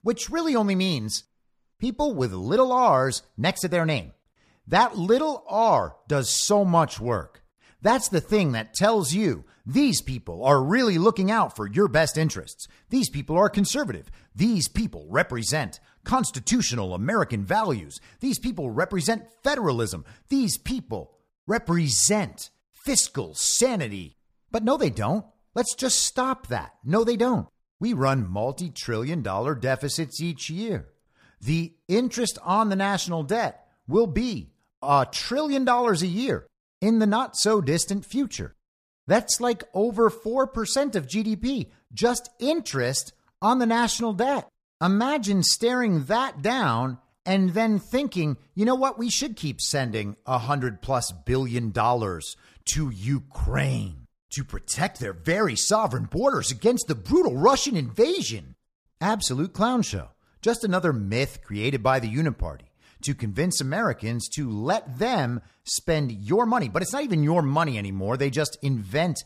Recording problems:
none

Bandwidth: 14.5 kHz